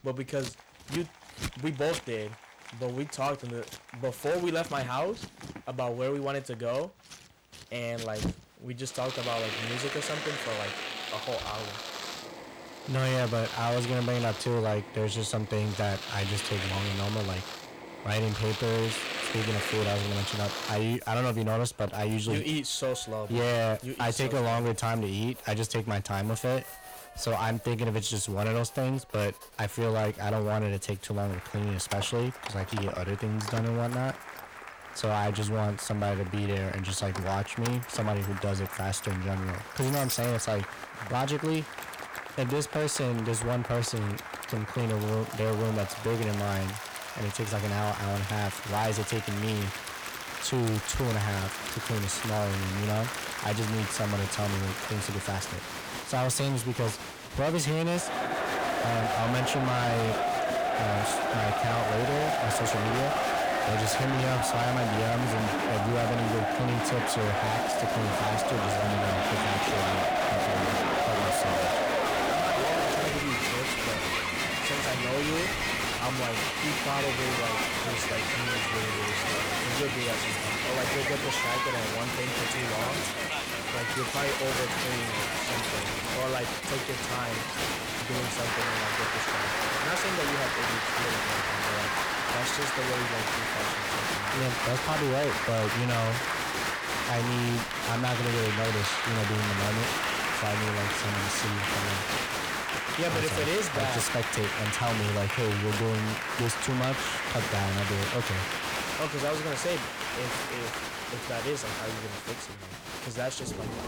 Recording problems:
distortion; heavy; 17% of the sound clipped
crowd noise; very loud; throughout; 1 dB above the speech
household noises; noticeable; throughout; 10 dB below the speech

